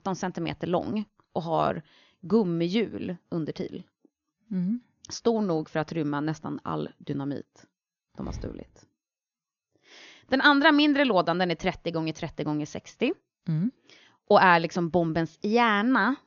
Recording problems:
high frequencies cut off; noticeable; nothing above 6.5 kHz

